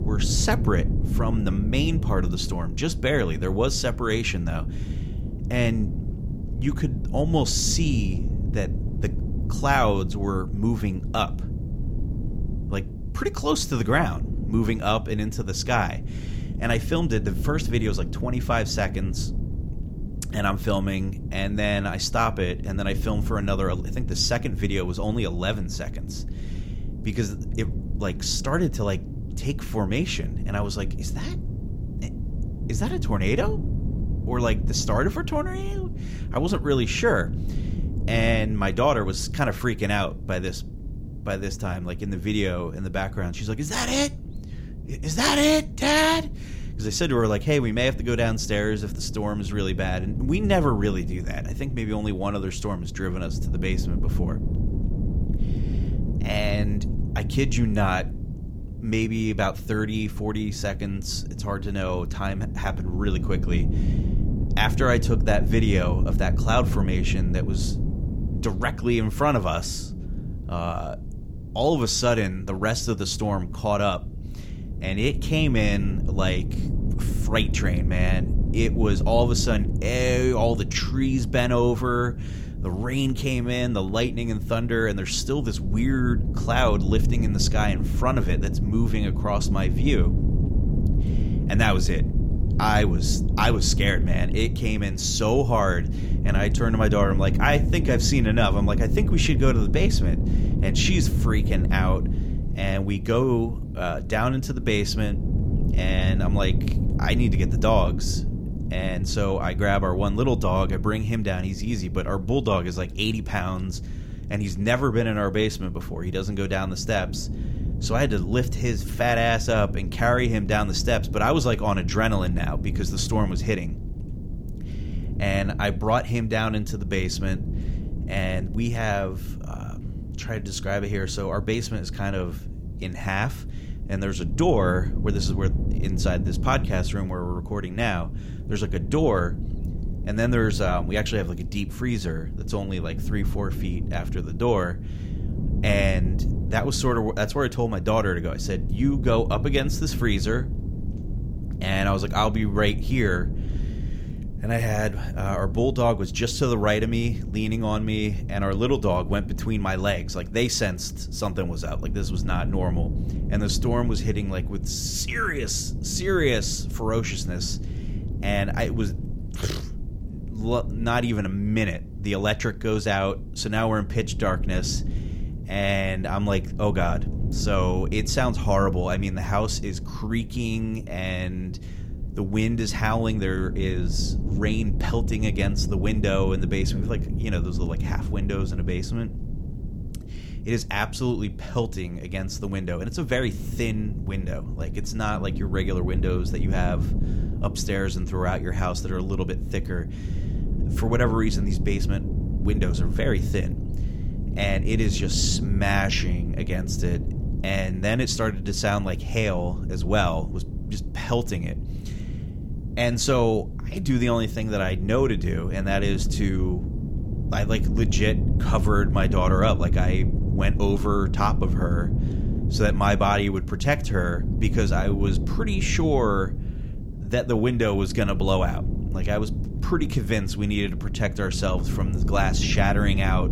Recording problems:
wind noise on the microphone; occasional gusts; 15 dB below the speech

